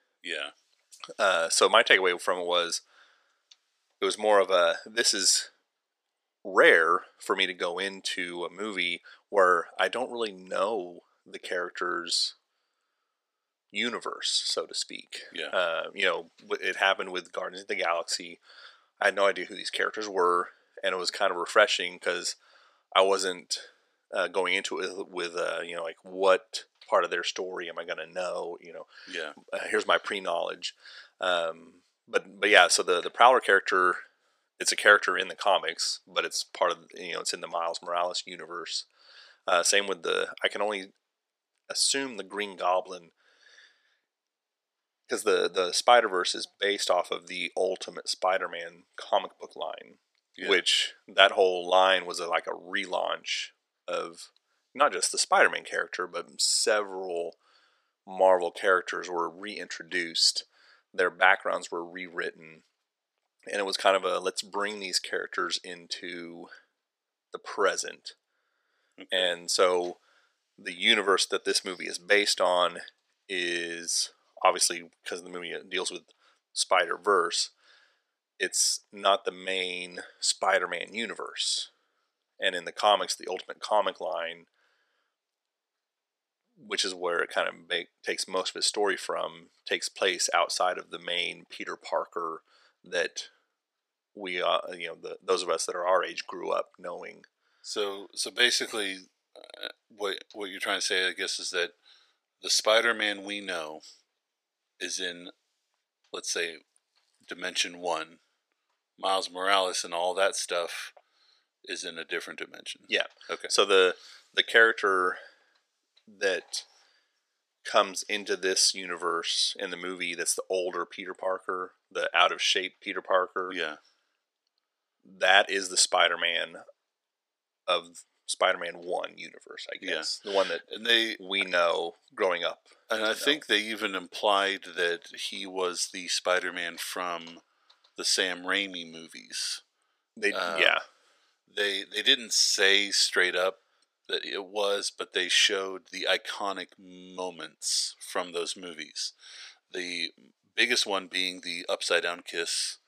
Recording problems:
thin; somewhat; fading below 500 Hz

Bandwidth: 15 kHz